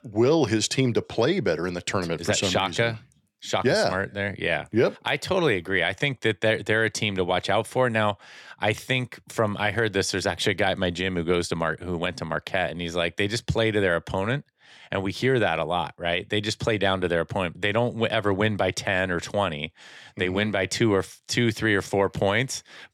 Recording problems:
none

